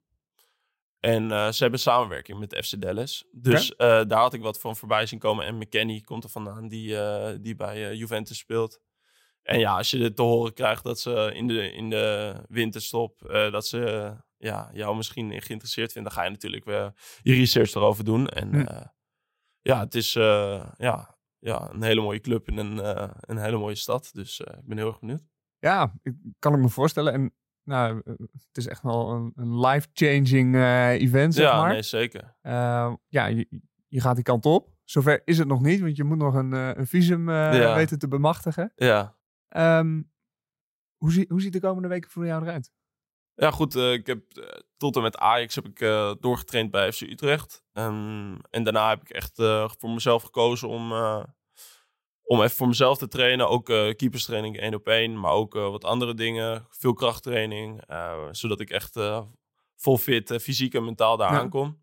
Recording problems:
none

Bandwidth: 16 kHz